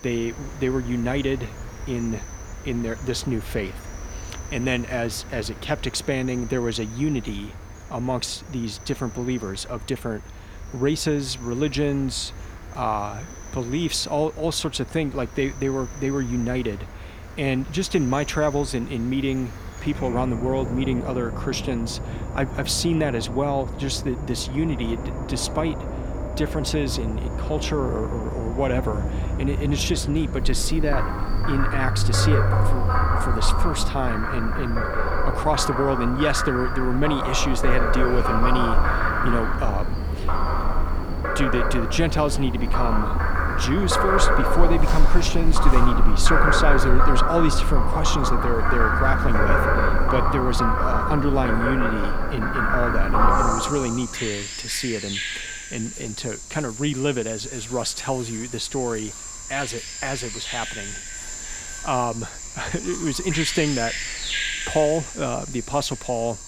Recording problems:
animal sounds; very loud; throughout; as loud as the speech

